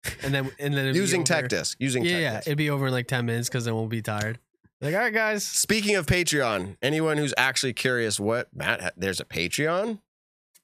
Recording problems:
none

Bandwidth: 14.5 kHz